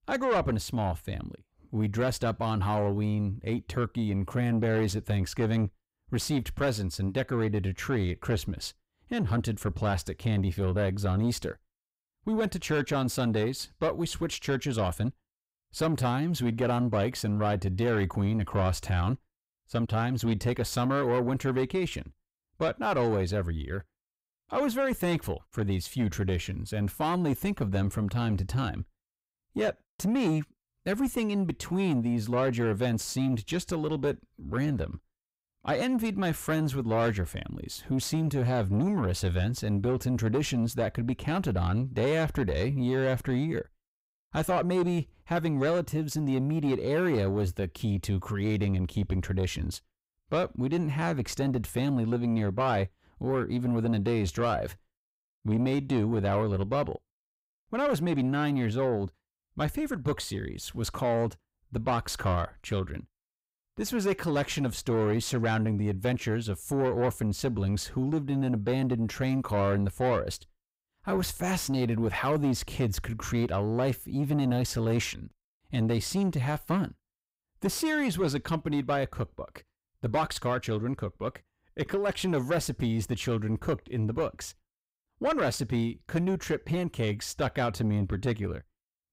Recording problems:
distortion; slight; 10 dB below the speech

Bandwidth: 15.5 kHz